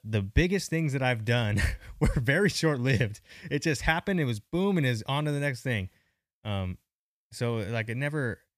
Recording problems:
none

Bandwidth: 14.5 kHz